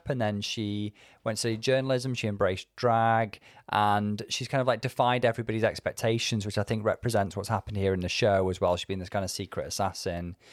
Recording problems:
none

